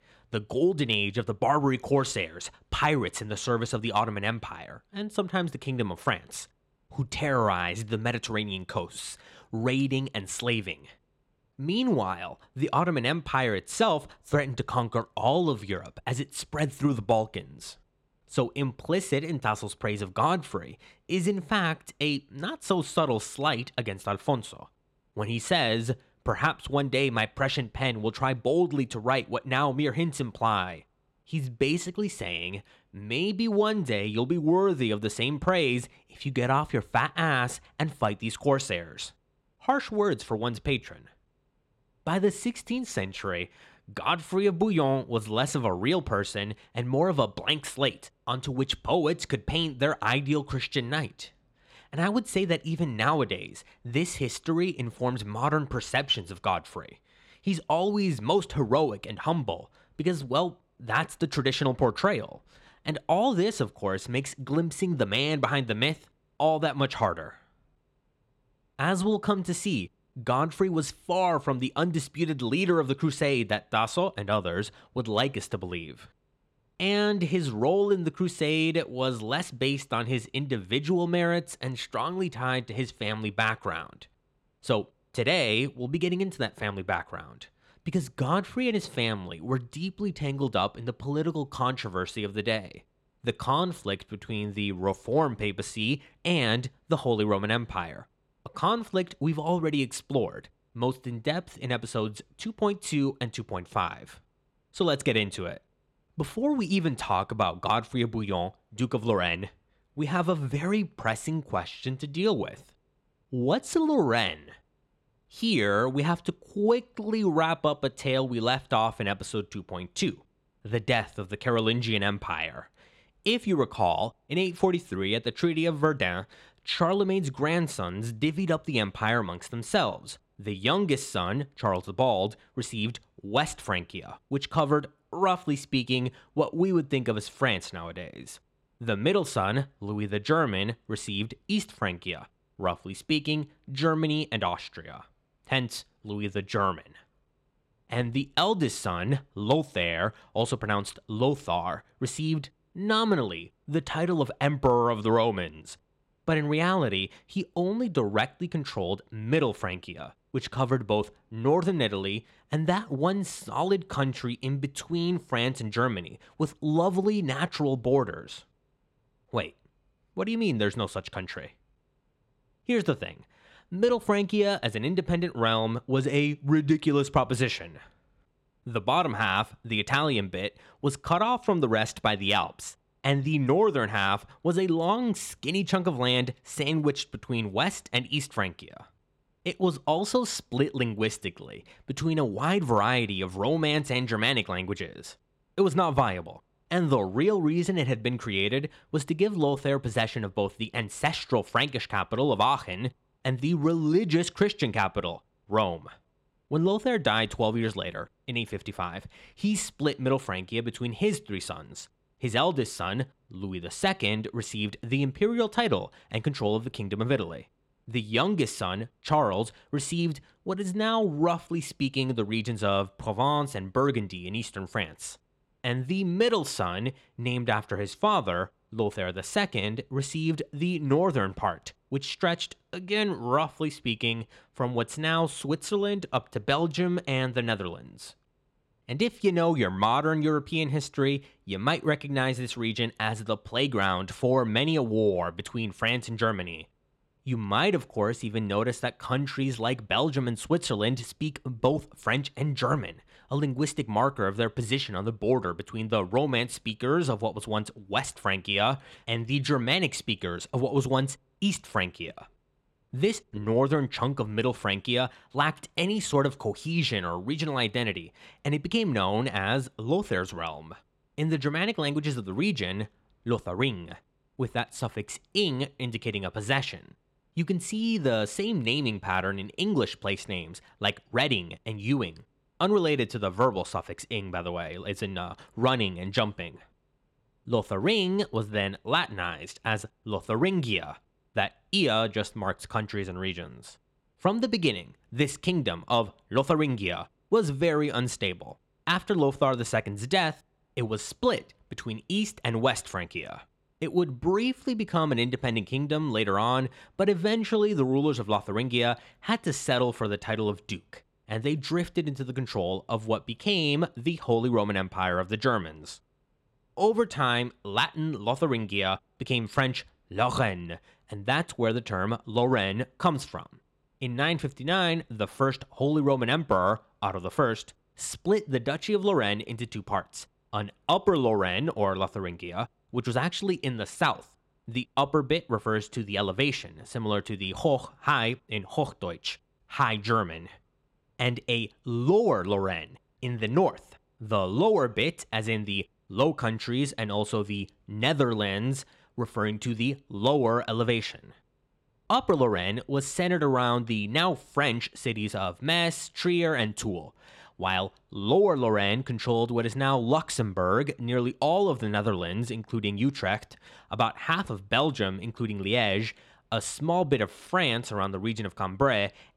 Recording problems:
none

